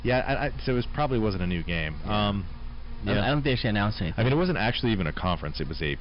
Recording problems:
high frequencies cut off; noticeable; nothing above 5.5 kHz
distortion; slight; 7% of the sound clipped
electrical hum; very faint; throughout; 60 Hz, 20 dB below the speech

